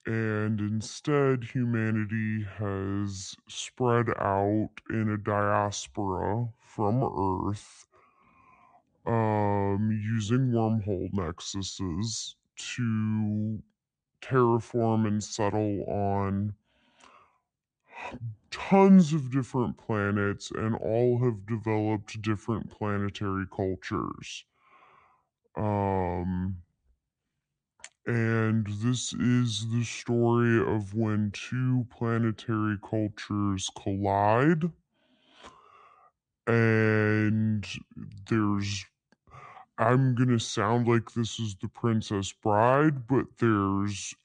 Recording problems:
wrong speed and pitch; too slow and too low; 0.7 times normal speed

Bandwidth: 9.5 kHz